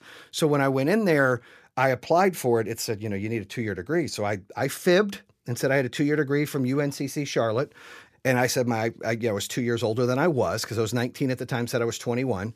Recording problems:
none

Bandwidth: 15 kHz